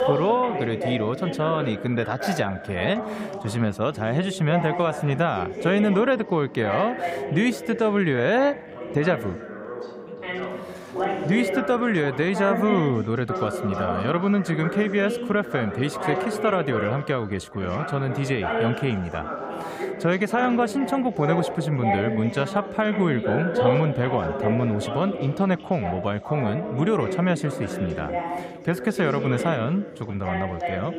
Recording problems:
background chatter; loud; throughout; 4 voices, 5 dB below the speech

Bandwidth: 15.5 kHz